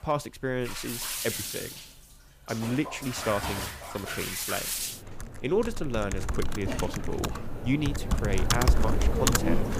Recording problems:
household noises; very loud; throughout; 1 dB above the speech

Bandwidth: 15 kHz